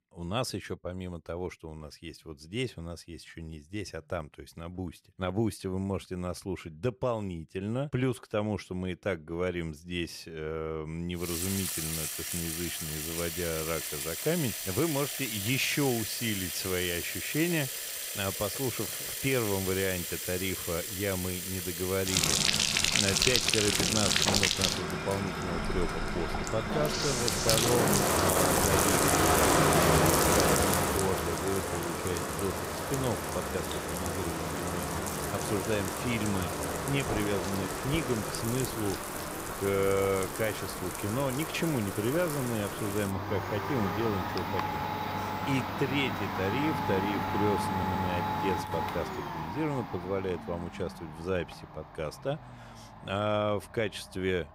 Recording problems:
household noises; very loud; from 11 s on; 3 dB above the speech
audio stuttering; at 48 s

